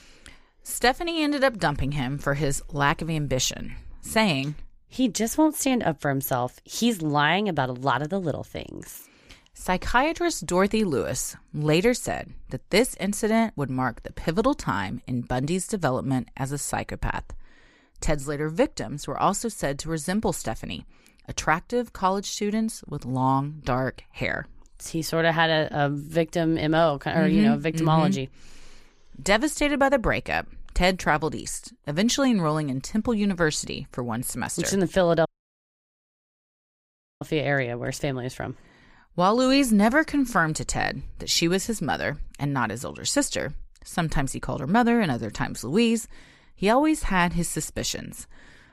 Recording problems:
audio cutting out; at 35 s for 2 s

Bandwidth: 15 kHz